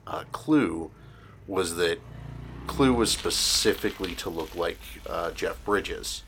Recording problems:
traffic noise; noticeable; throughout; 15 dB below the speech

